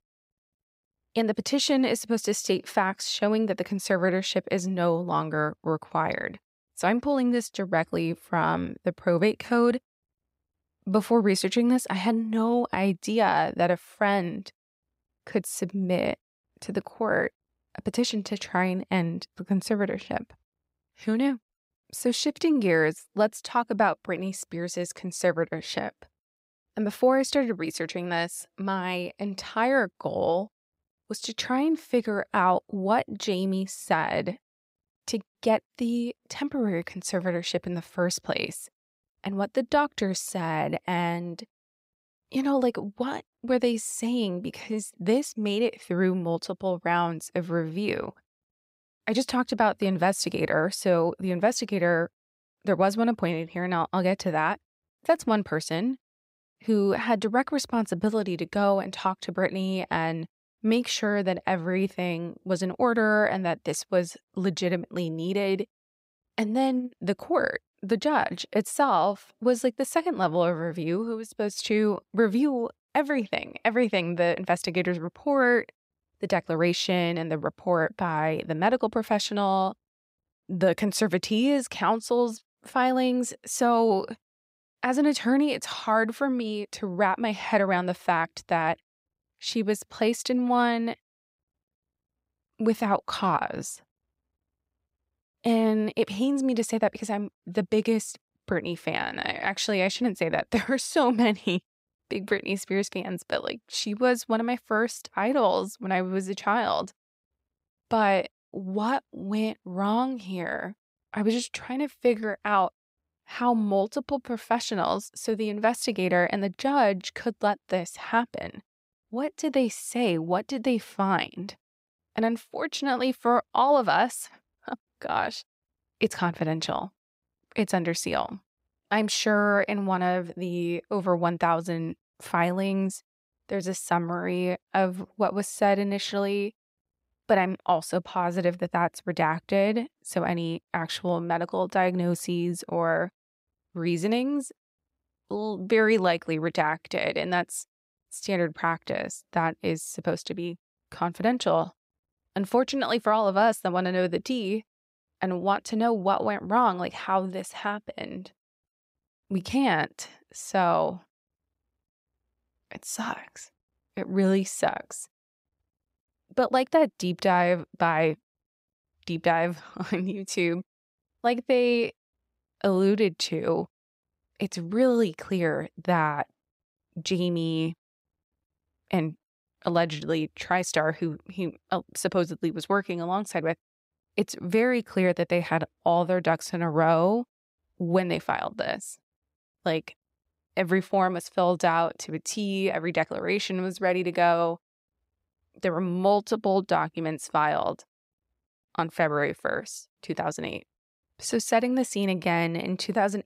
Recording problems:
none

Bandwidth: 15.5 kHz